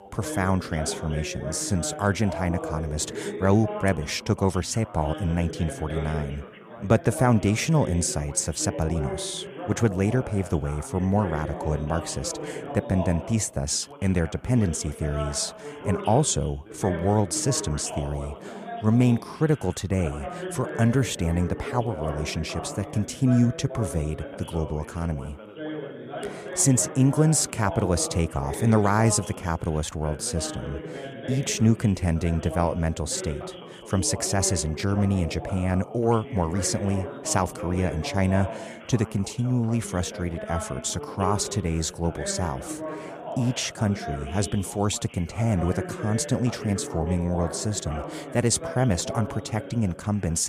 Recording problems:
background chatter; noticeable; throughout; 2 voices, 10 dB below the speech
abrupt cut into speech; at the end

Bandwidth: 14.5 kHz